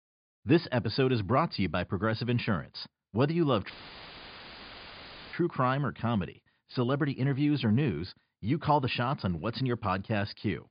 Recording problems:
high frequencies cut off; severe; nothing above 5 kHz
audio cutting out; filled with static; at 3.5 s for 1.5 s

